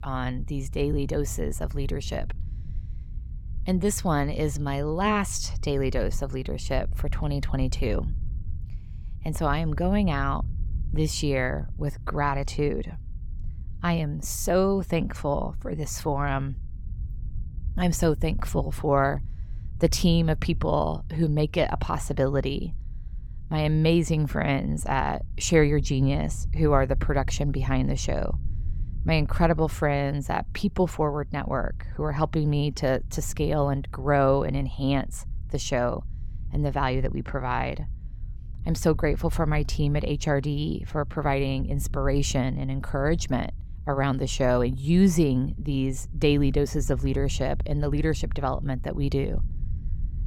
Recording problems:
low rumble; faint; throughout; 25 dB below the speech

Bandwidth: 17 kHz